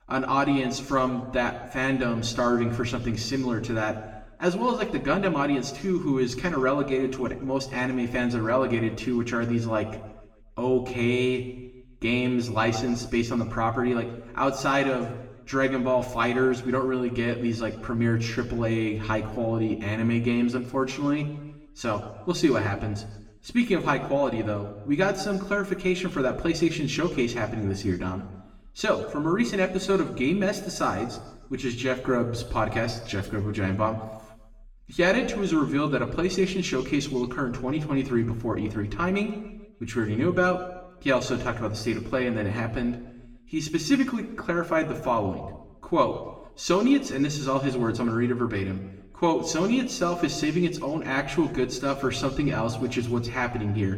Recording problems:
room echo; slight; dies away in 0.9 s
off-mic speech; somewhat distant

